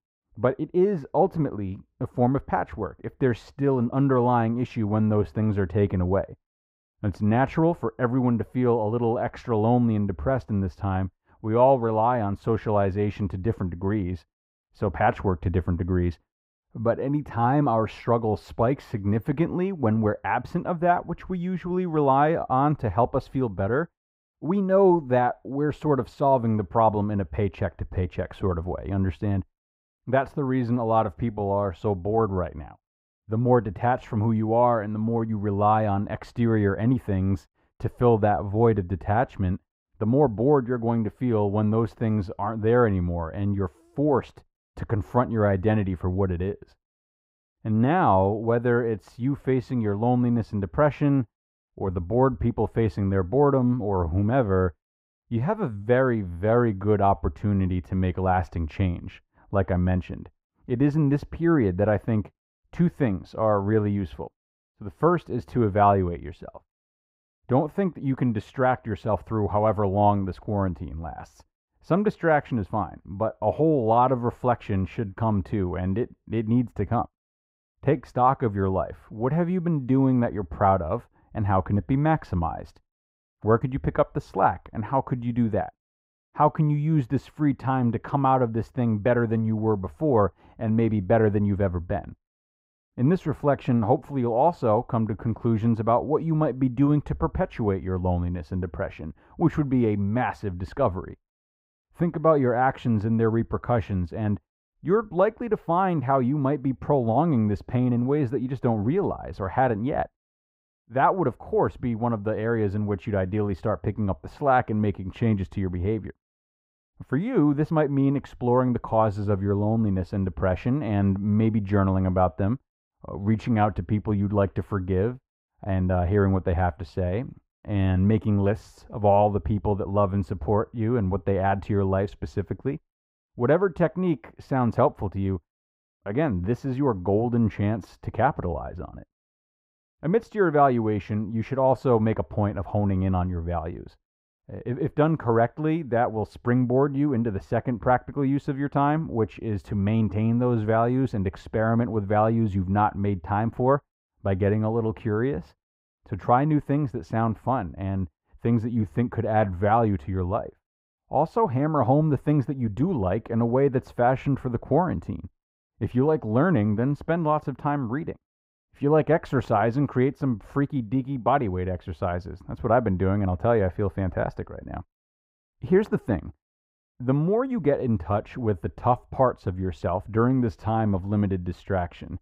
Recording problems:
muffled; very; fading above 3 kHz

